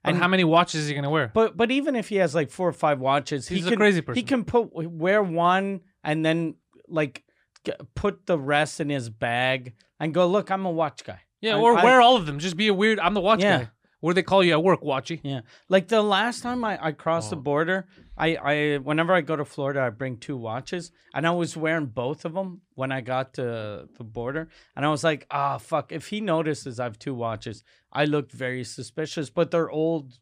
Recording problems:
none

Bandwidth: 14.5 kHz